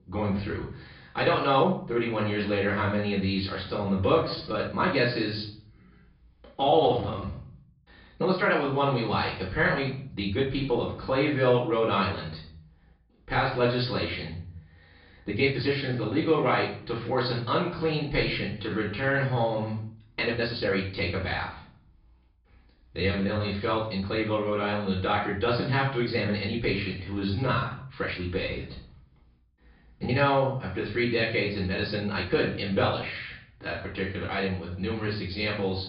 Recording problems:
off-mic speech; far
room echo; noticeable; dies away in 0.5 s
high frequencies cut off; noticeable; nothing above 5.5 kHz
uneven, jittery; strongly; from 1 to 35 s

